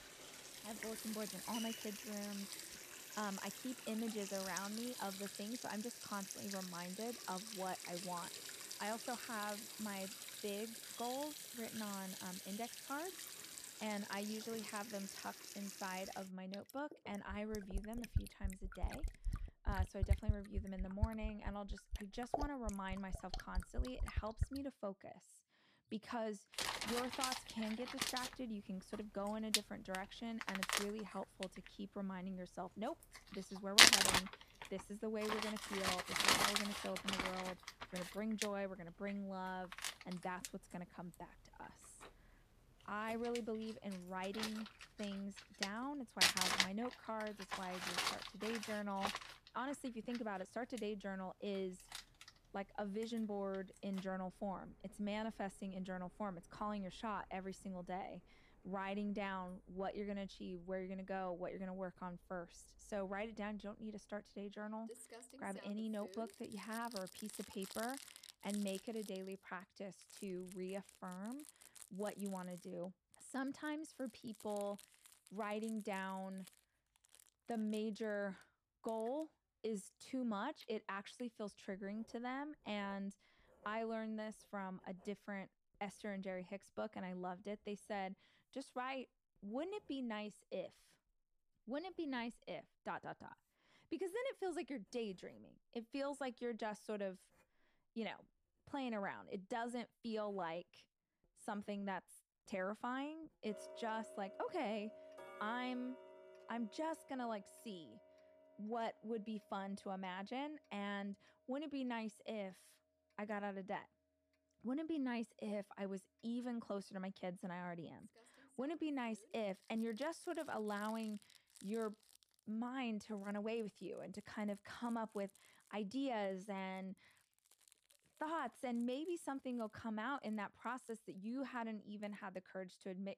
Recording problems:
household noises; very loud; throughout; 4 dB above the speech

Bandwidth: 14.5 kHz